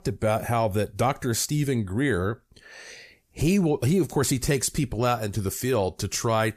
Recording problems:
none

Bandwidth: 14.5 kHz